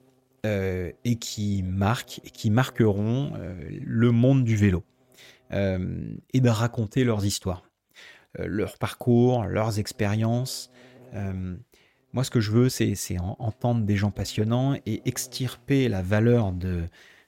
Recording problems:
electrical hum; faint; until 6 s and from 9.5 to 16 s; 60 Hz, 30 dB below the speech

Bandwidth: 16 kHz